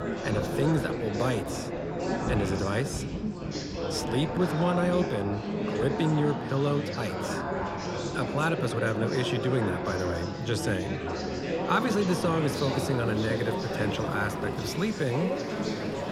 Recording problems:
chatter from many people; loud; throughout; 3 dB below the speech
rain or running water; noticeable; throughout; 15 dB below the speech

